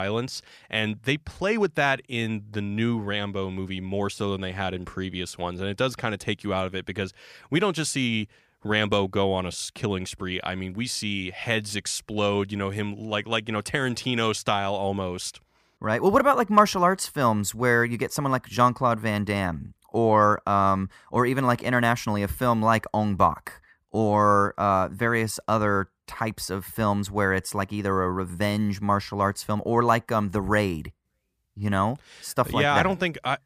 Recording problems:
abrupt cut into speech; at the start

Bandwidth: 15 kHz